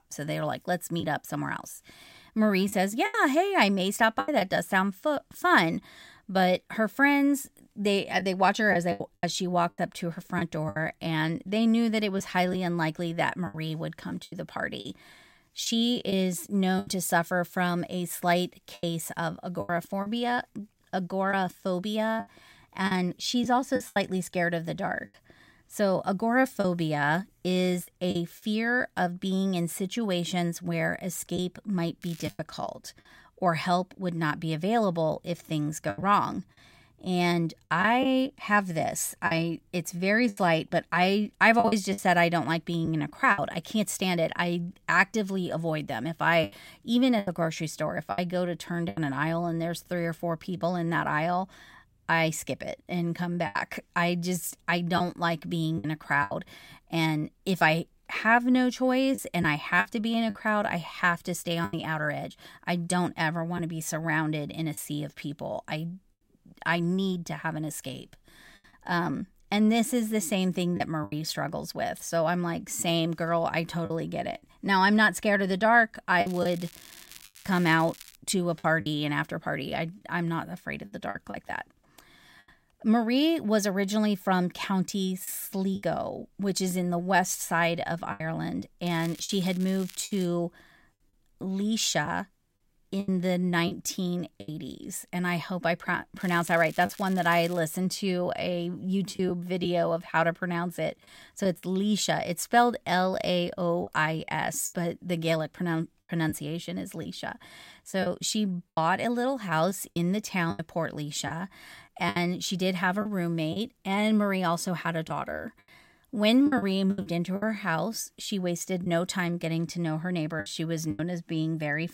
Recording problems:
crackling; noticeable; 4 times, first at 32 s; 20 dB below the speech
choppy; occasionally; 5% of the speech affected

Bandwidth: 16 kHz